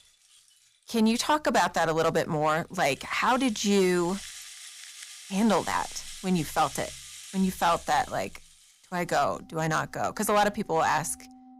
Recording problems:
distortion; slight; 3% of the sound clipped
background music; noticeable; throughout; 15 dB below the speech

